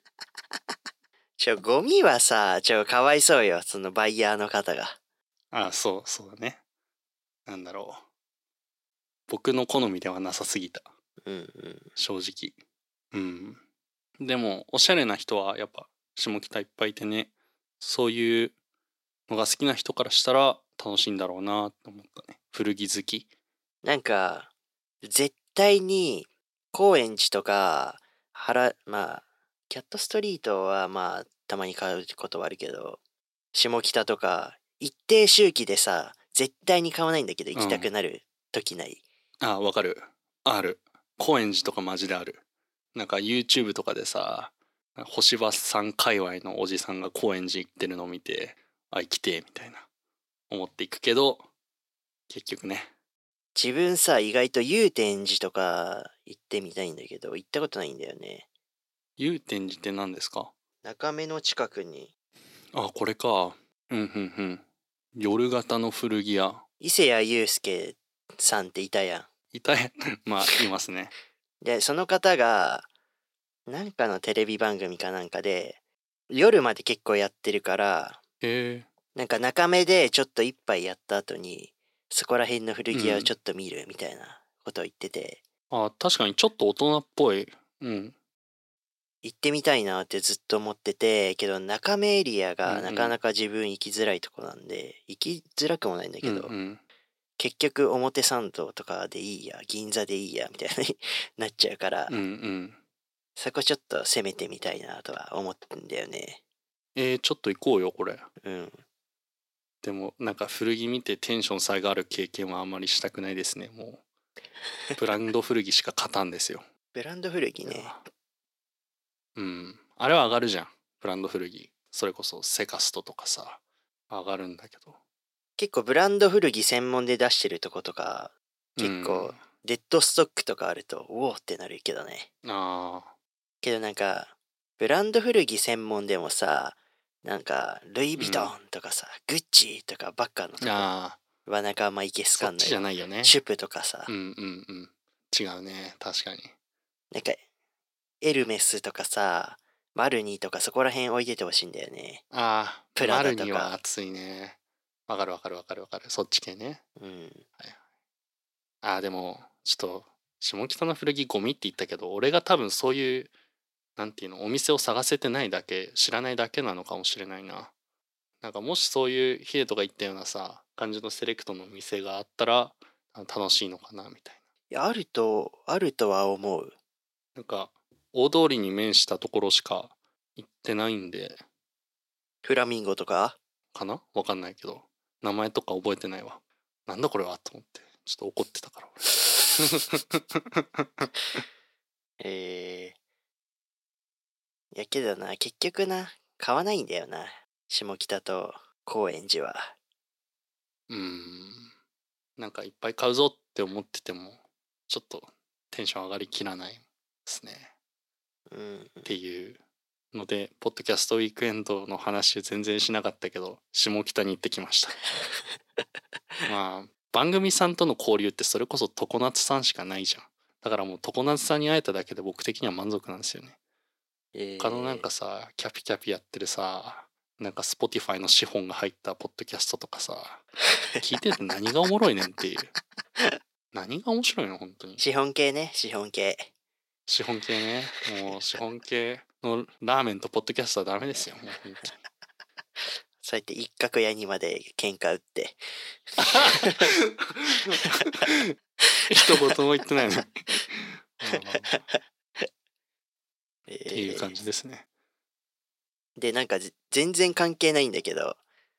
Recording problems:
thin; somewhat; fading below 300 Hz

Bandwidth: 16 kHz